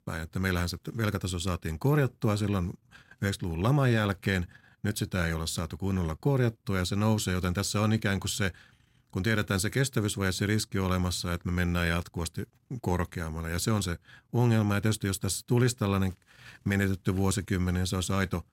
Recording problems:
none

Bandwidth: 16 kHz